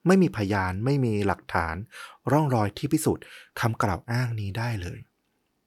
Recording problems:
none

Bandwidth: 19 kHz